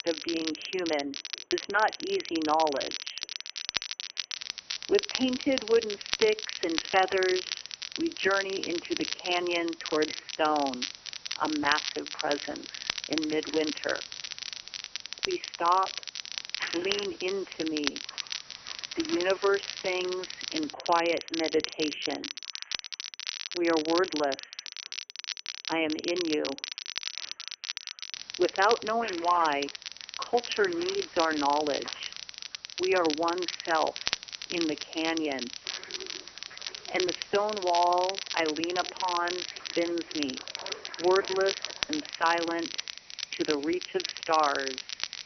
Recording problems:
phone-call audio; poor line; nothing above 3 kHz
crackle, like an old record; loud; 6 dB below the speech
household noises; noticeable; throughout; 20 dB below the speech
hiss; faint; from 4.5 to 21 s and from 28 s on; 20 dB below the speech

